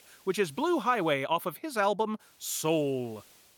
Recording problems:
hiss; faint; until 1 s and from 2 s on; 30 dB below the speech

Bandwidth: 18 kHz